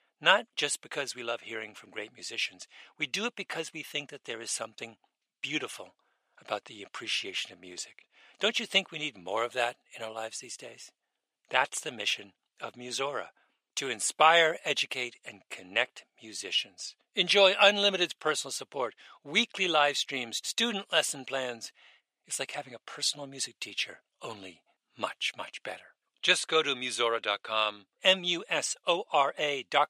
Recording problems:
thin; very; fading below 650 Hz

